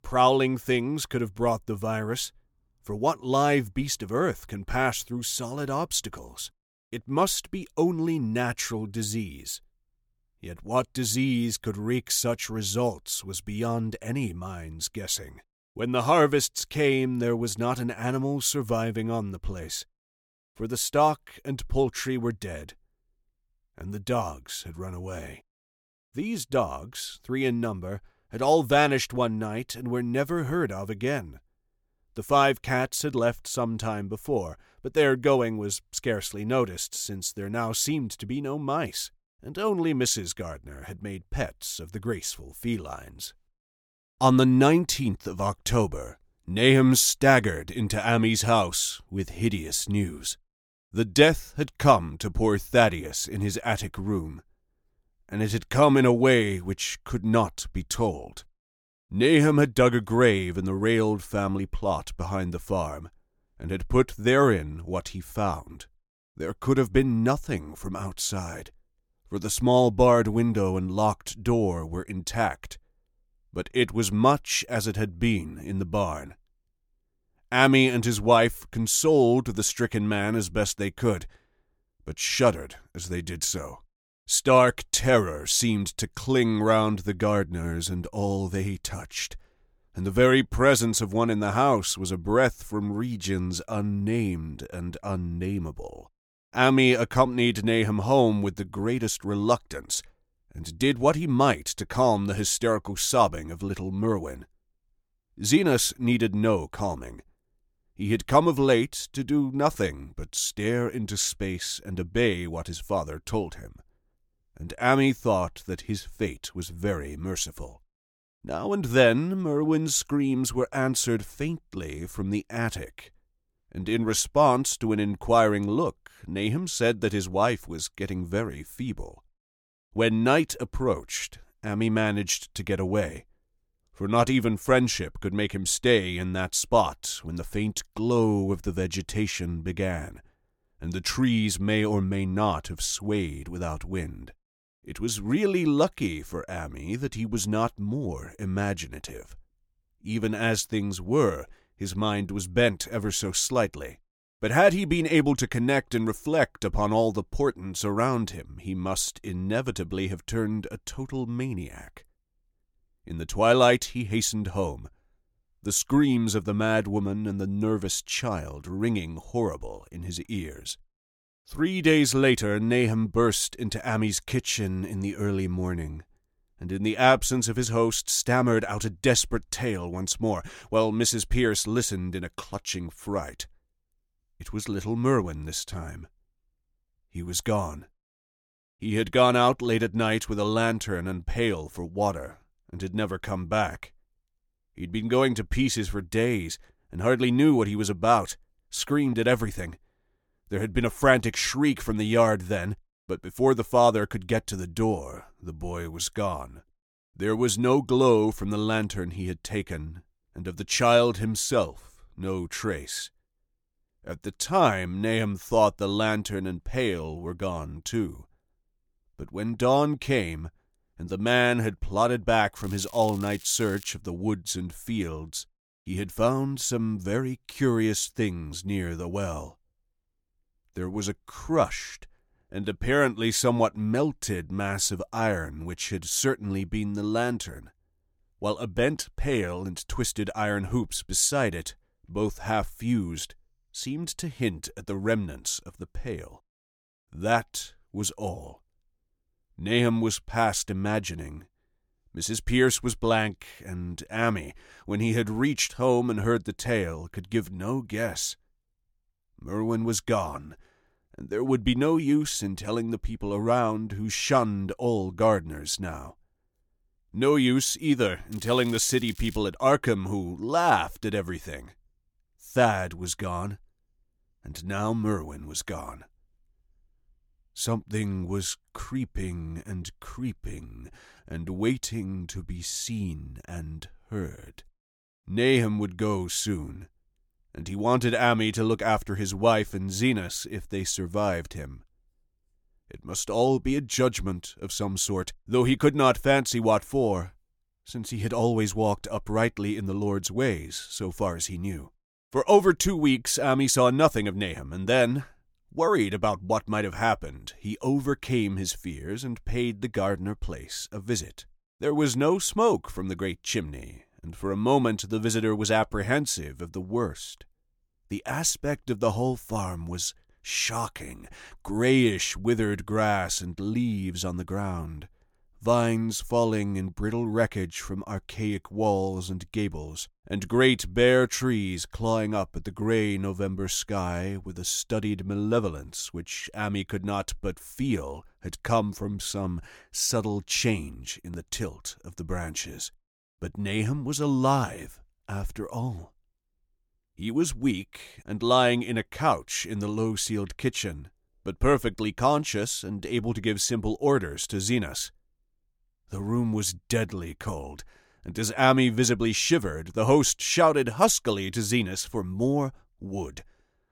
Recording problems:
crackling; faint; from 3:43 to 3:44 and from 4:28 to 4:29; 20 dB below the speech

